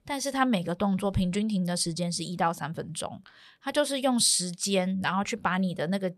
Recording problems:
none

